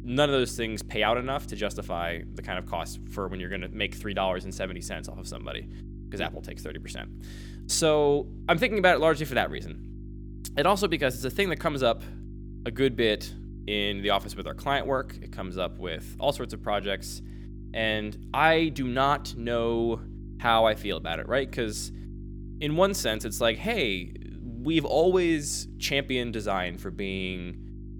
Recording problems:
electrical hum; faint; throughout; 50 Hz, 25 dB below the speech

